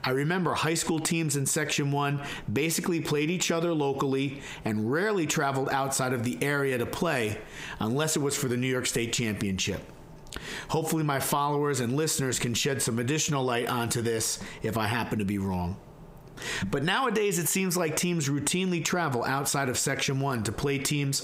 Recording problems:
squashed, flat; heavily

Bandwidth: 15.5 kHz